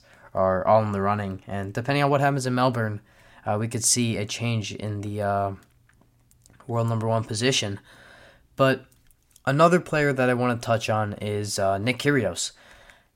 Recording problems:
none

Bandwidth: 16 kHz